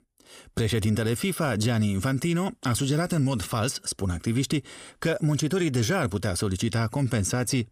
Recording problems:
none

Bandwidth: 15 kHz